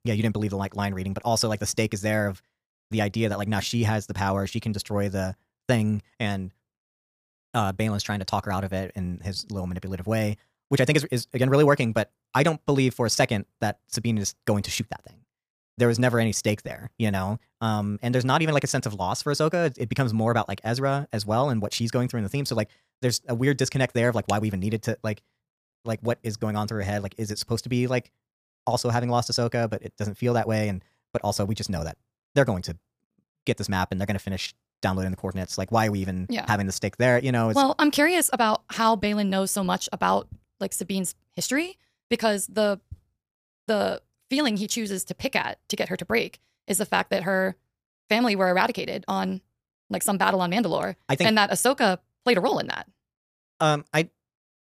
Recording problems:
wrong speed, natural pitch; too fast; 1.5 times normal speed

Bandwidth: 15 kHz